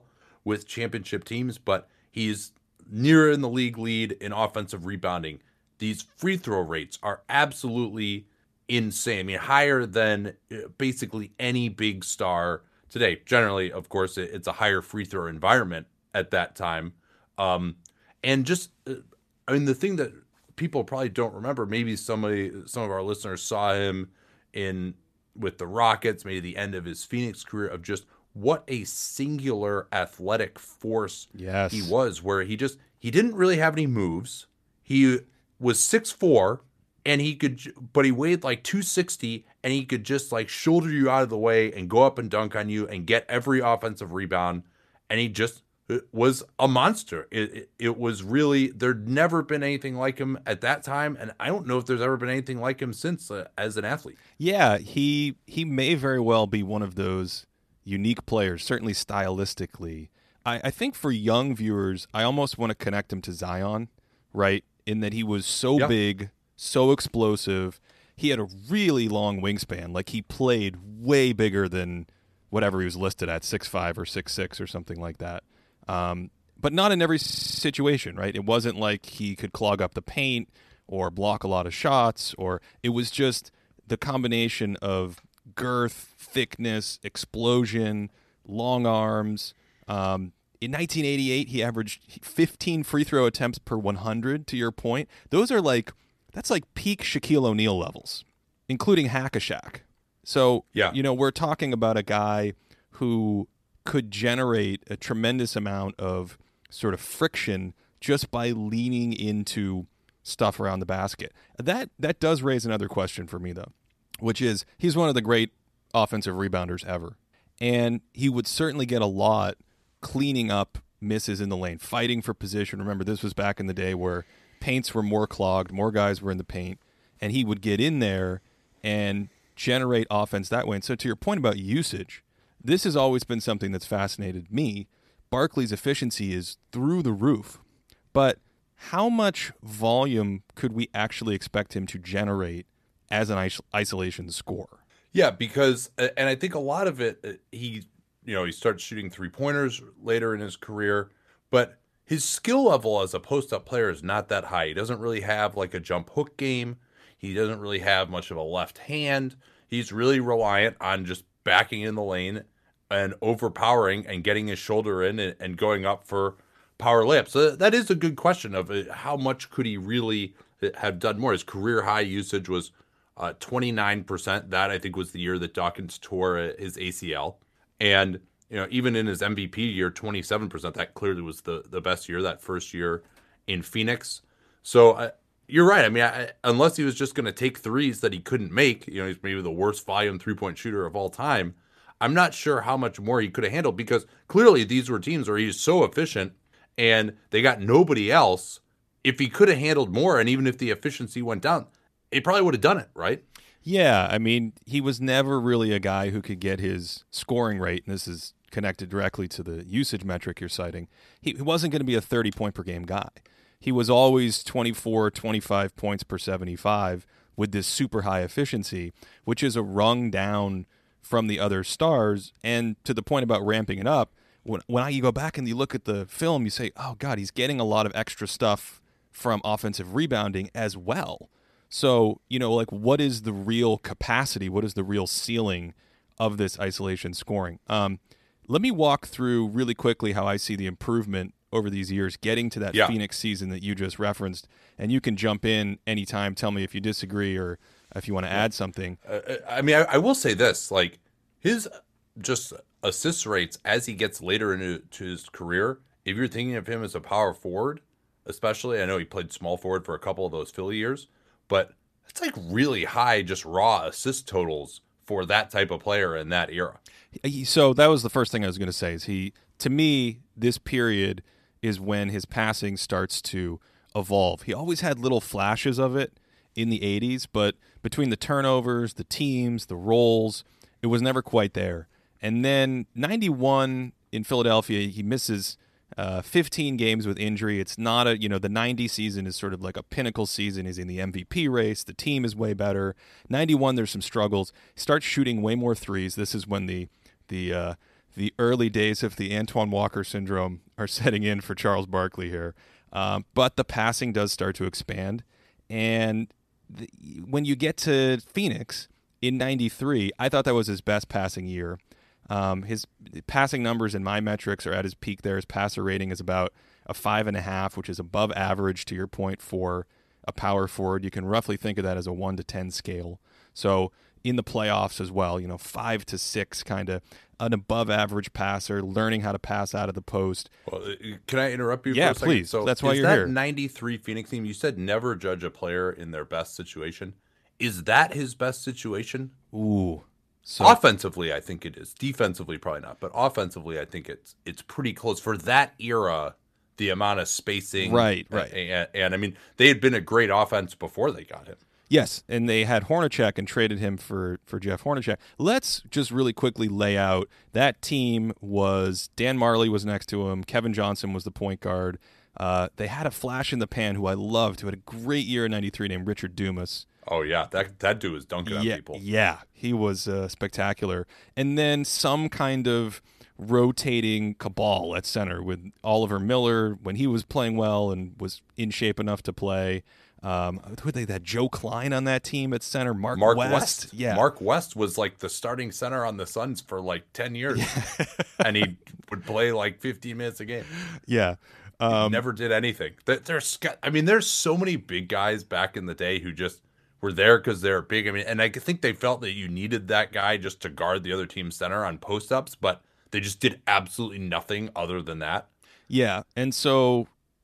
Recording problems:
audio freezing; at 1:17

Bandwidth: 14 kHz